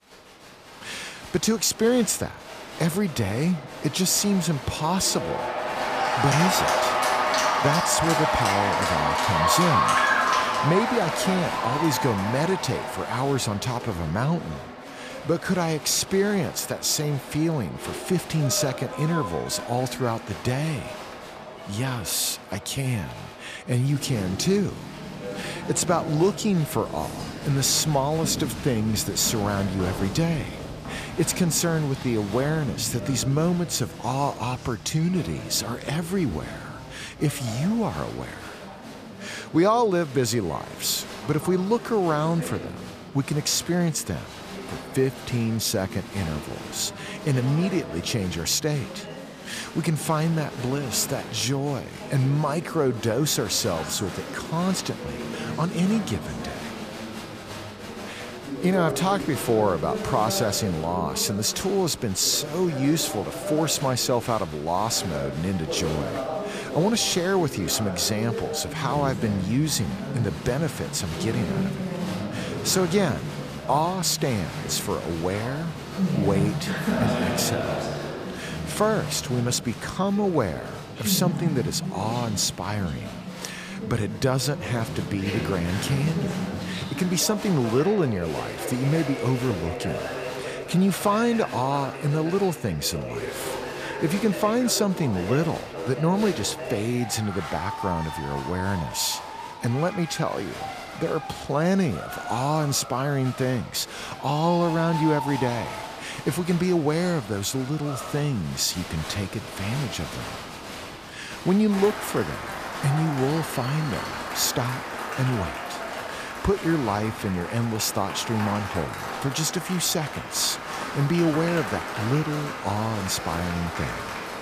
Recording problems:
crowd noise; loud; throughout; 6 dB below the speech

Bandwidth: 14.5 kHz